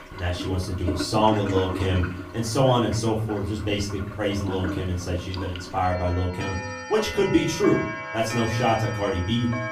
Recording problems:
off-mic speech; far
room echo; slight; dies away in 0.4 s
household noises; loud; throughout; 9 dB below the speech

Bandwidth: 15.5 kHz